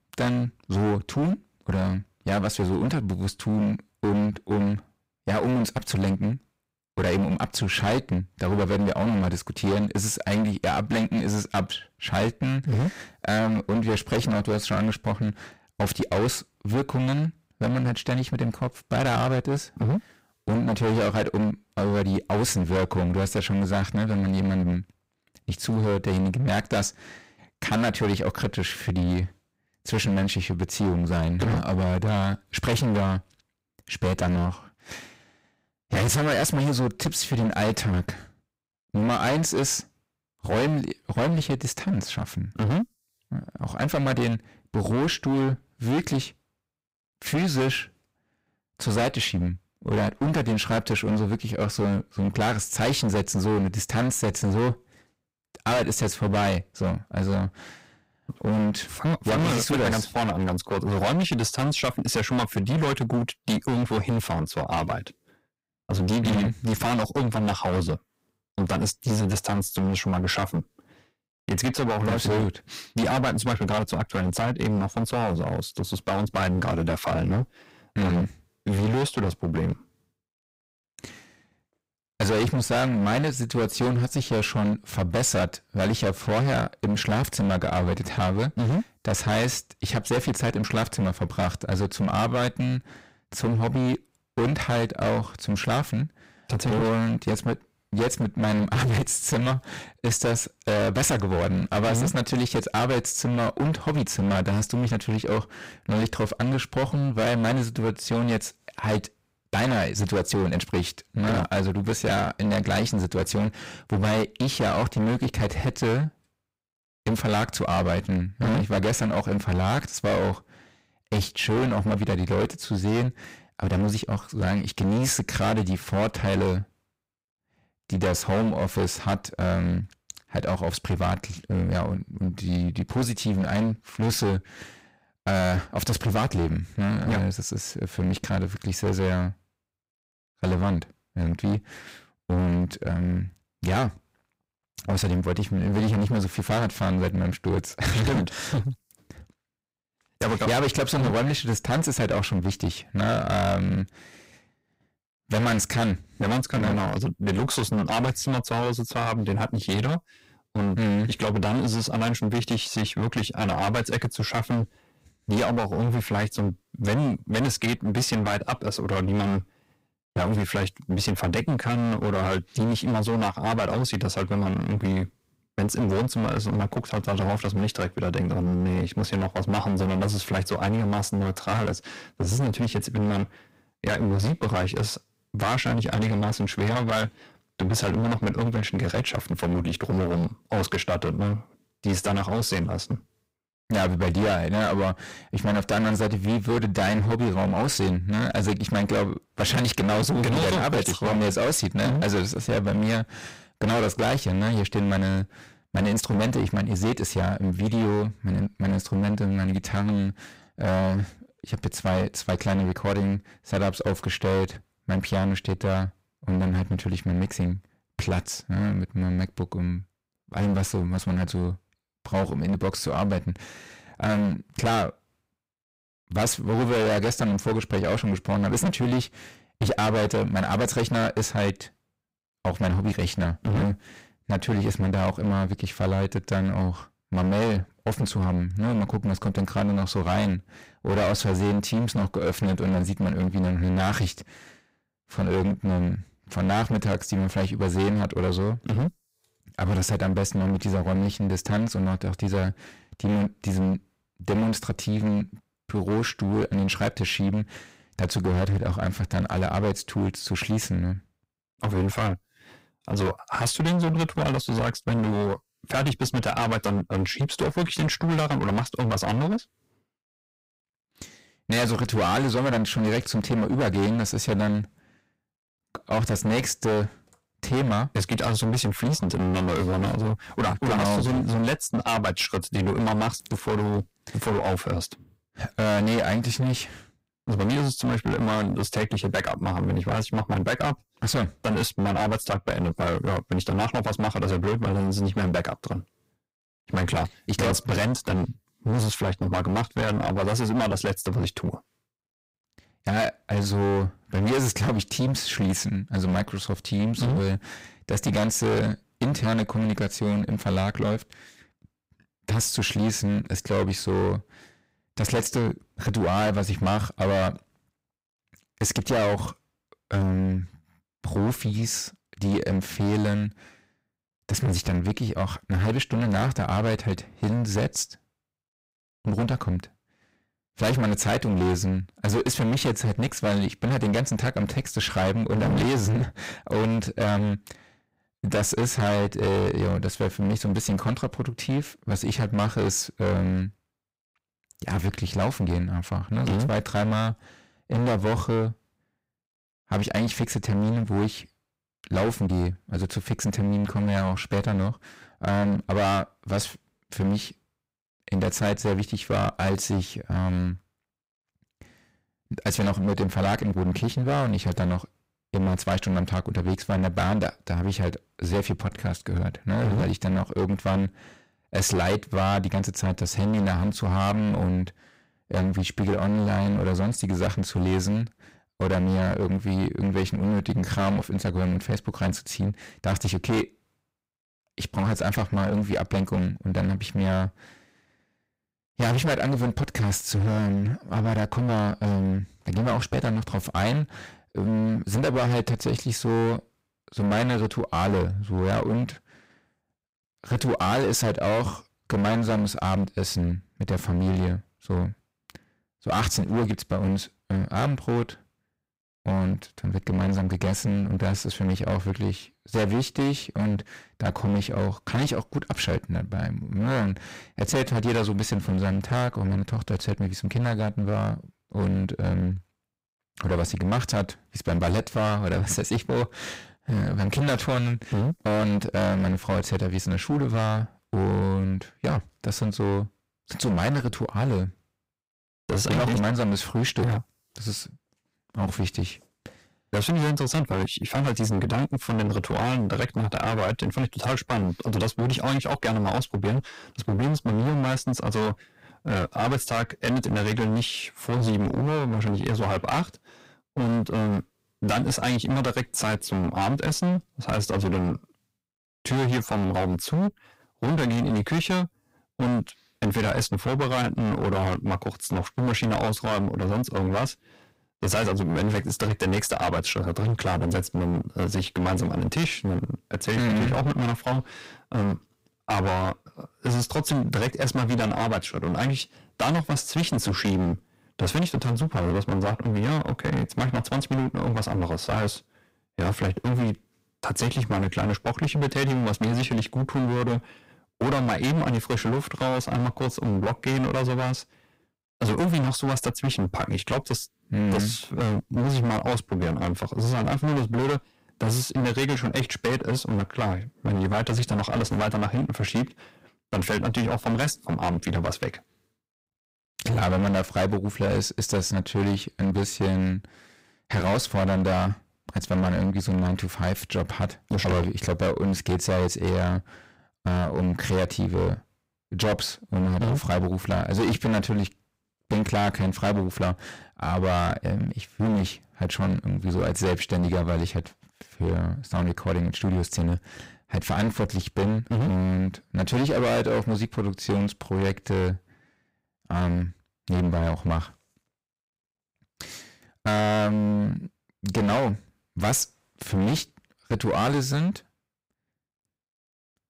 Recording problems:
distortion; heavy; 21% of the sound clipped

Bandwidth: 15.5 kHz